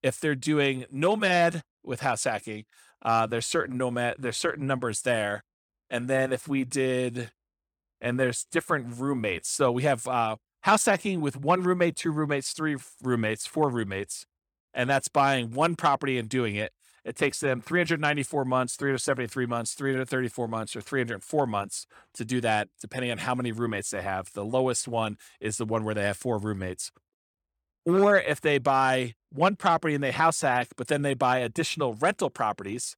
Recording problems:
none

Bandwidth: 18 kHz